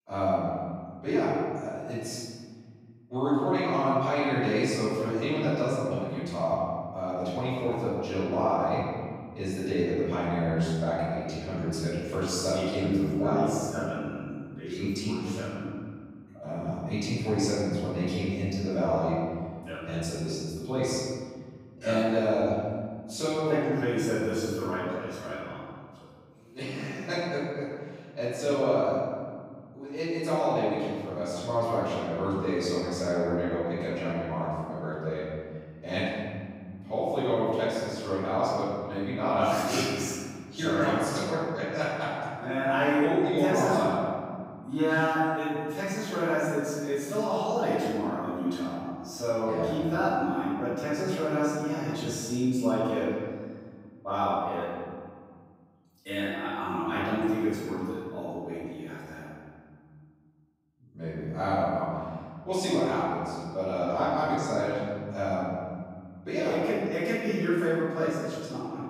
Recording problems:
room echo; strong; dies away in 2.1 s
off-mic speech; far

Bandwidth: 15.5 kHz